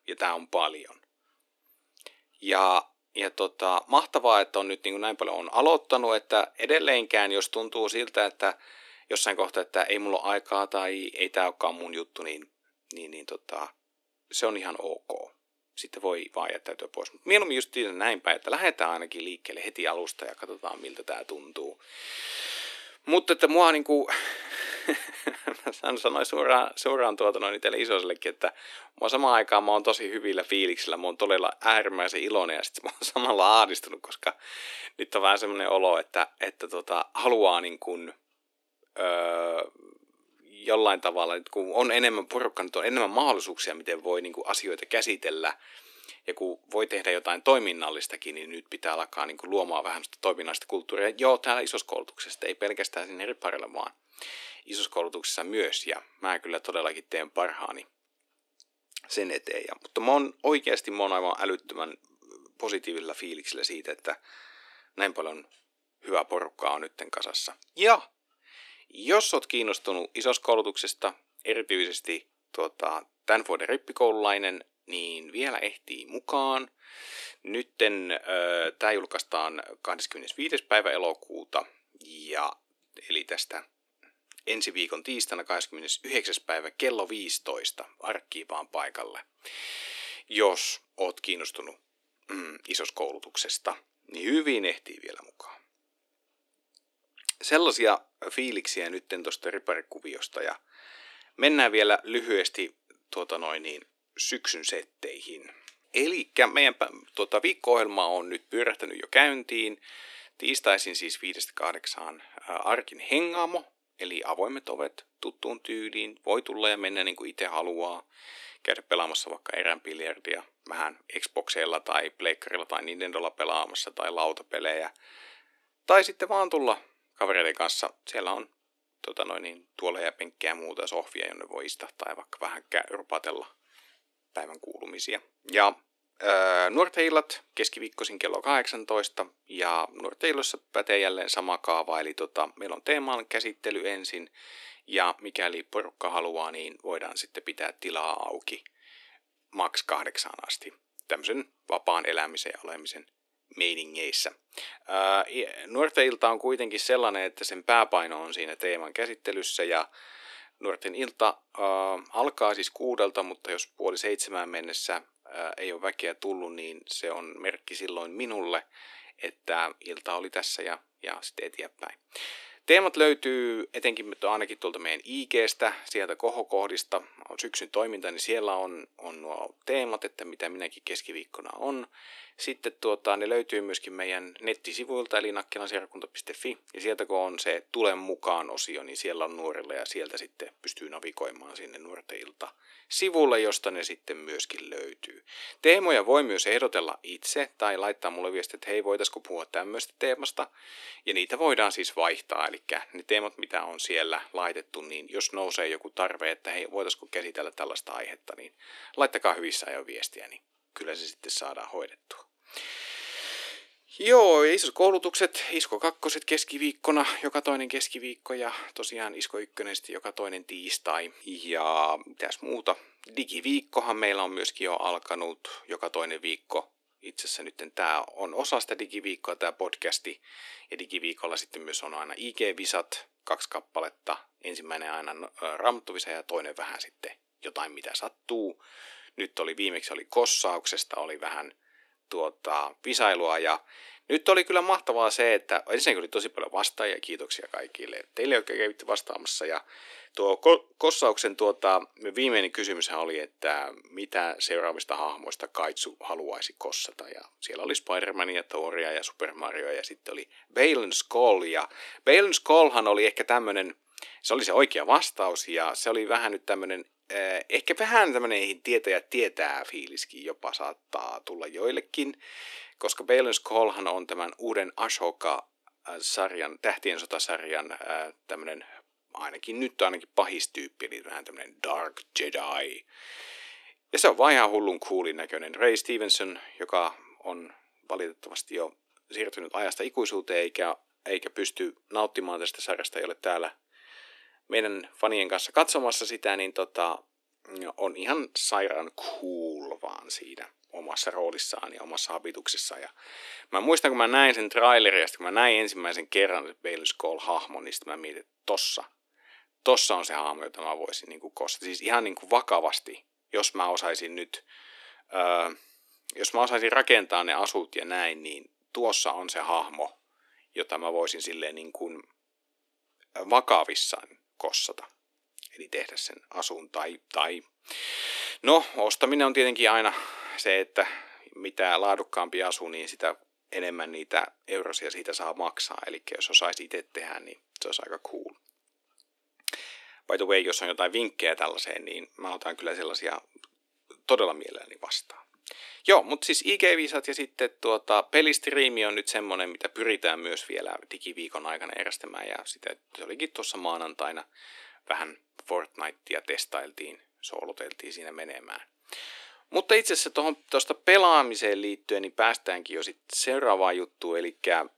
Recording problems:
thin; somewhat; fading below 300 Hz

